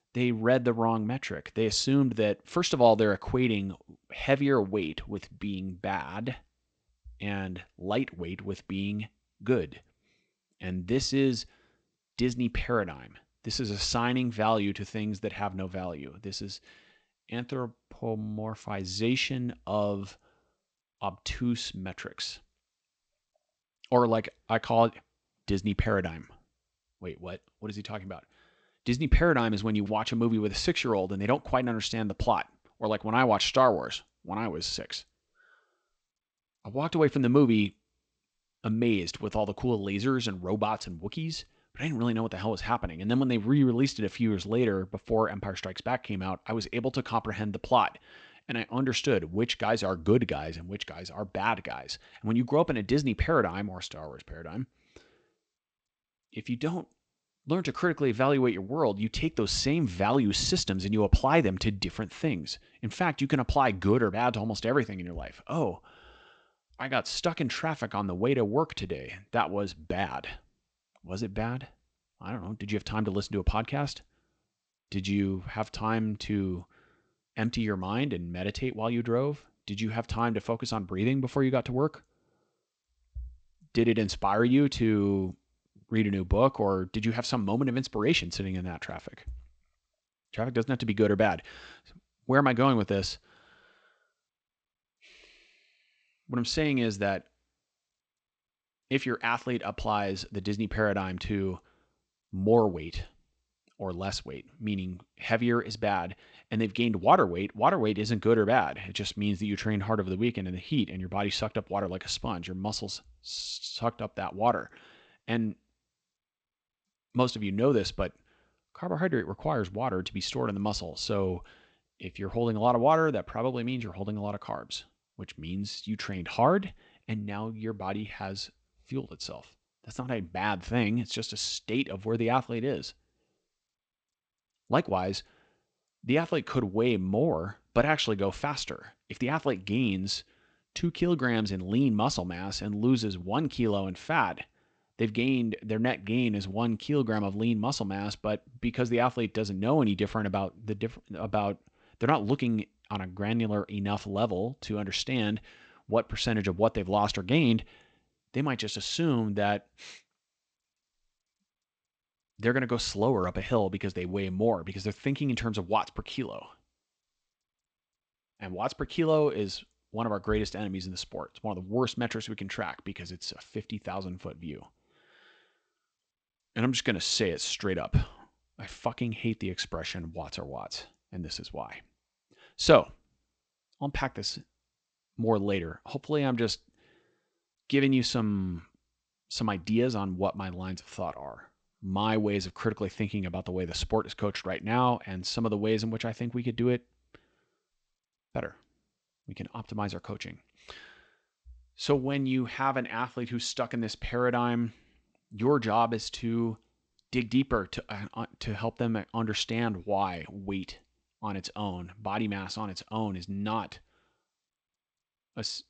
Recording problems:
garbled, watery; slightly; nothing above 8 kHz

